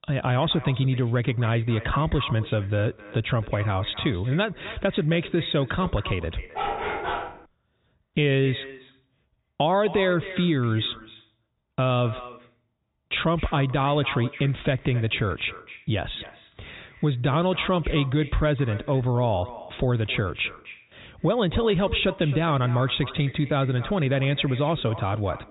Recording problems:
high frequencies cut off; severe; nothing above 4 kHz
echo of what is said; noticeable; throughout; 260 ms later, 15 dB below the speech
dog barking; noticeable; at 6.5 s; peak 3 dB below the speech

